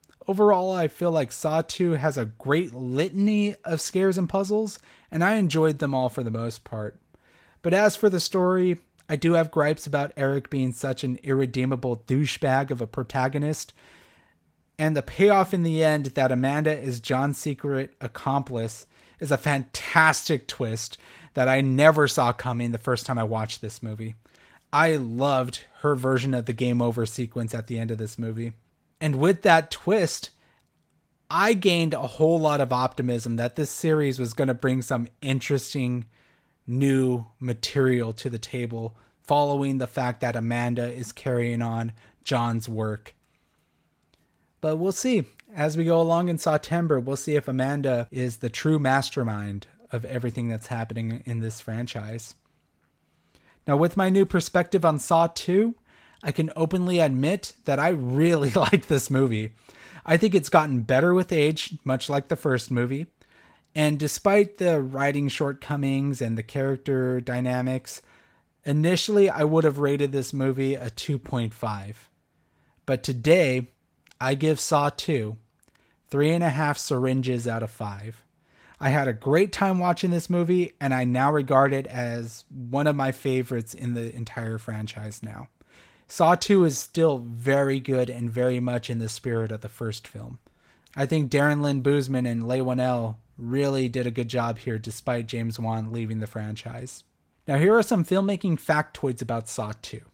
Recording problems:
garbled, watery; slightly; nothing above 16 kHz

